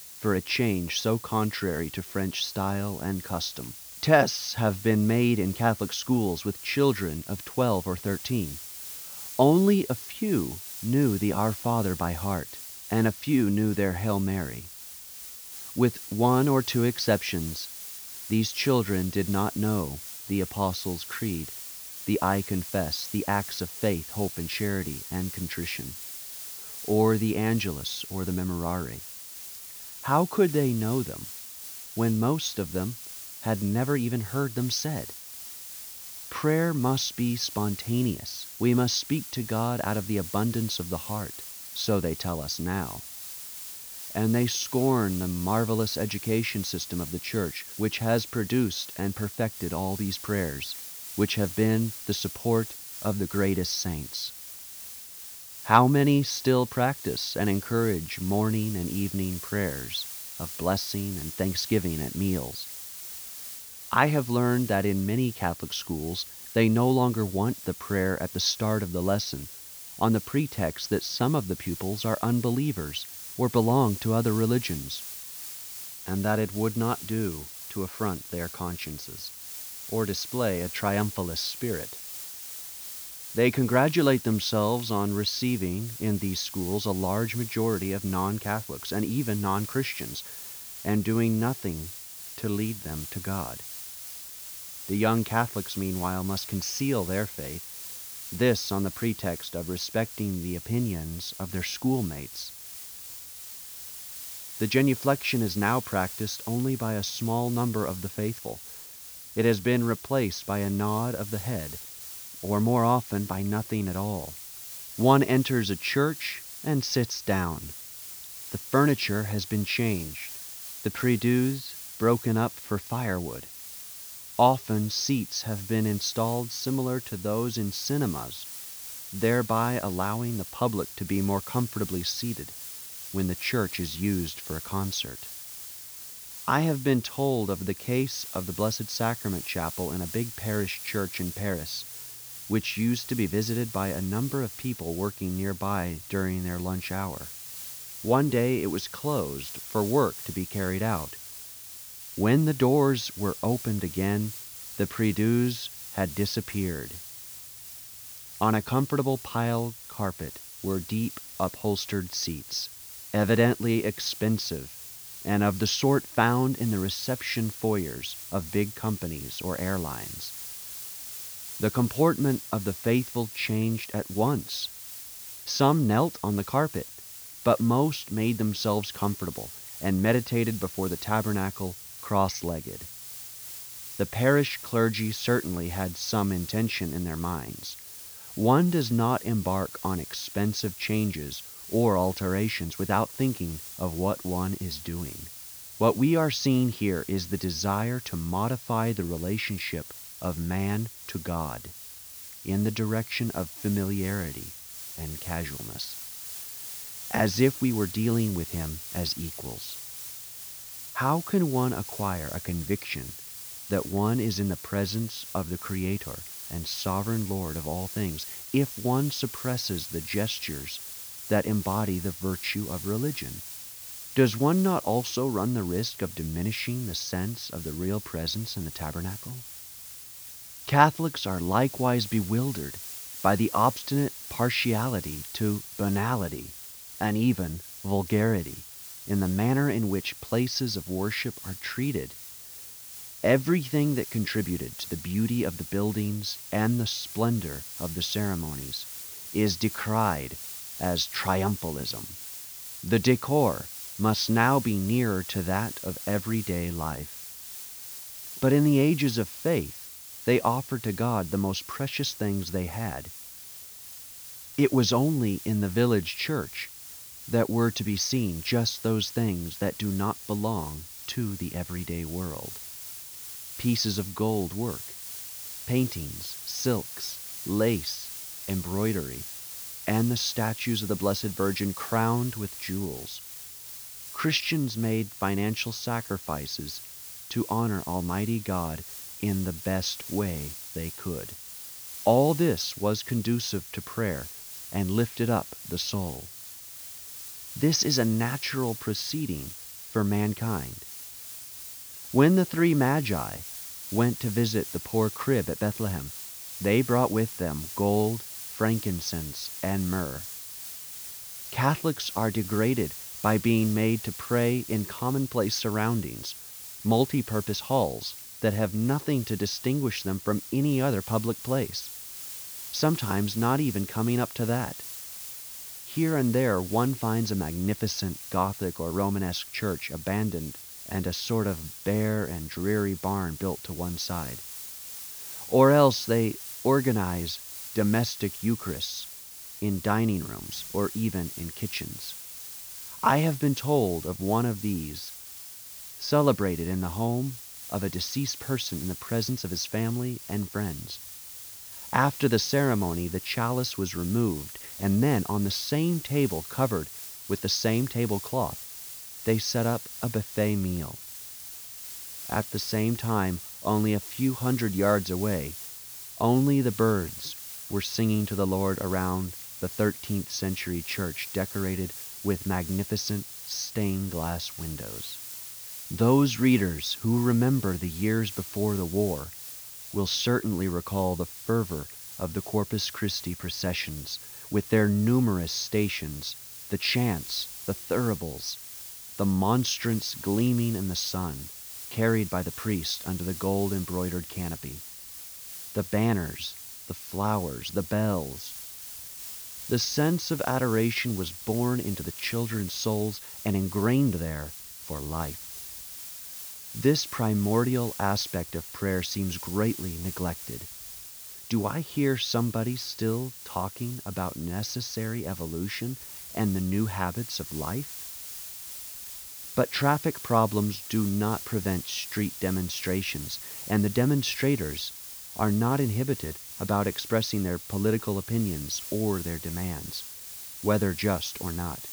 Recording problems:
high frequencies cut off; noticeable; nothing above 6.5 kHz
hiss; noticeable; throughout; 10 dB below the speech

